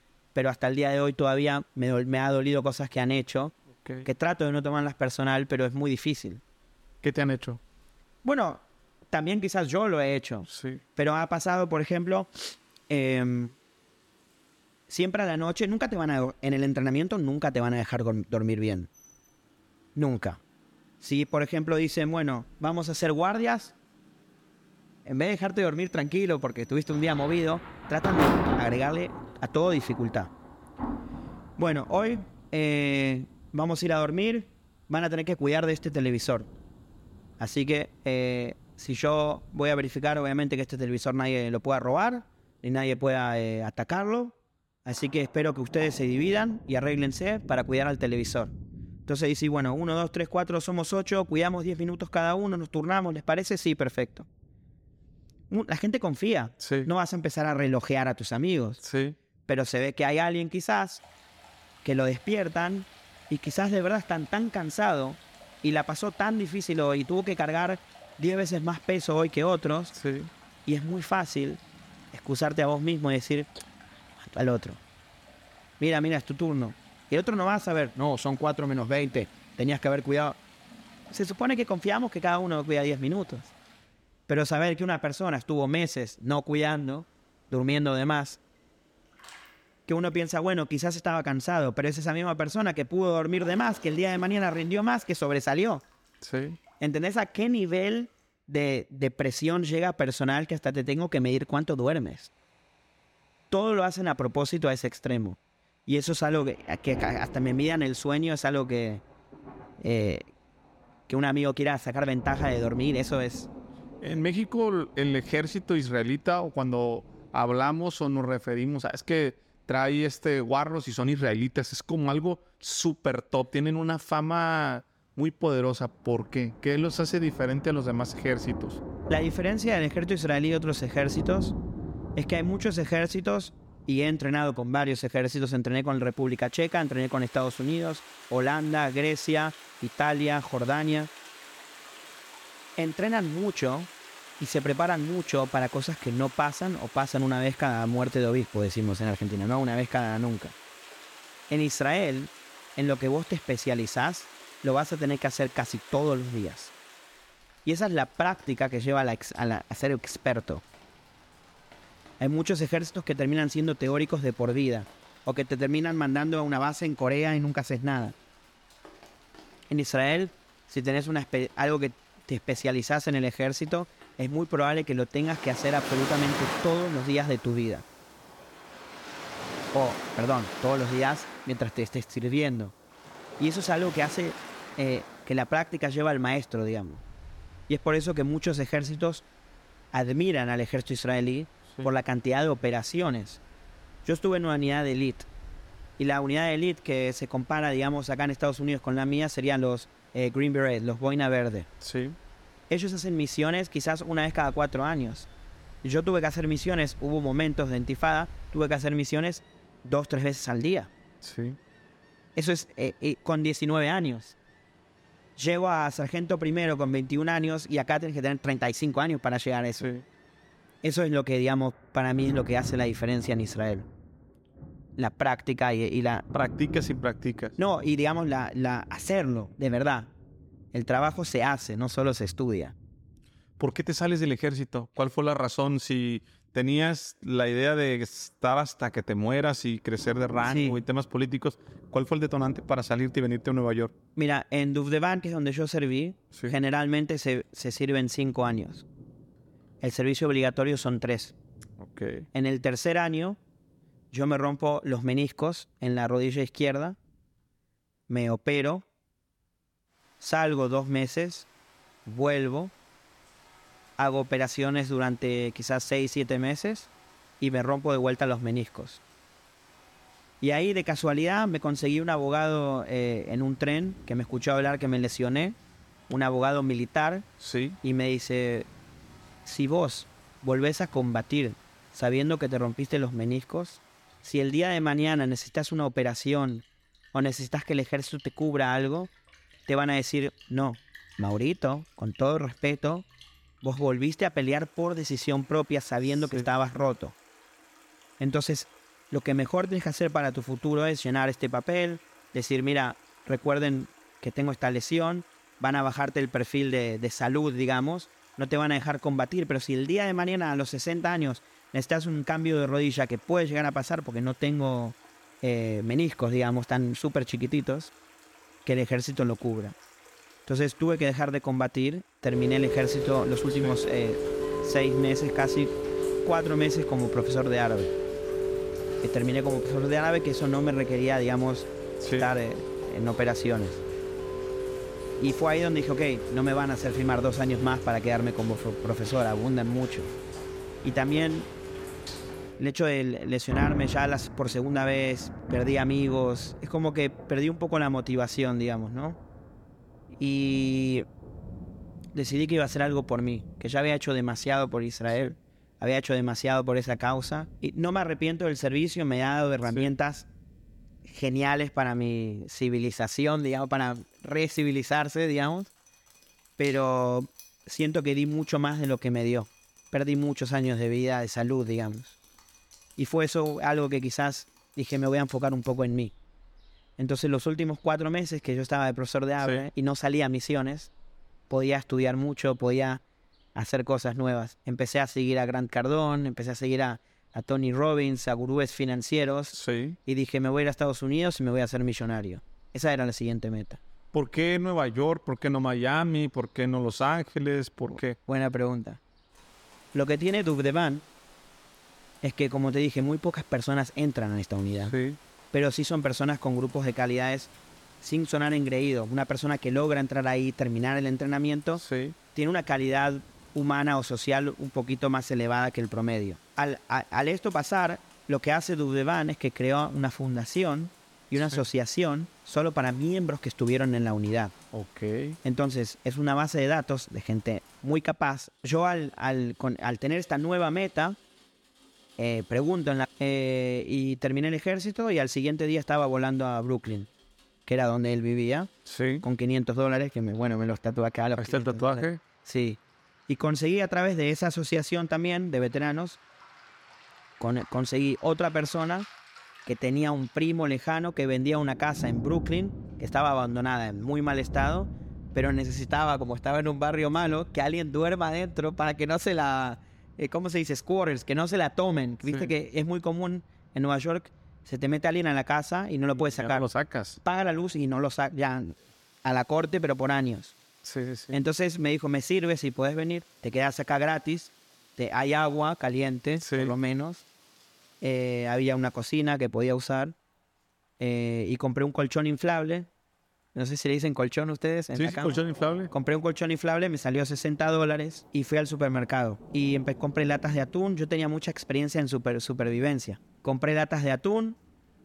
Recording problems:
rain or running water; noticeable; throughout; 10 dB below the speech

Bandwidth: 17.5 kHz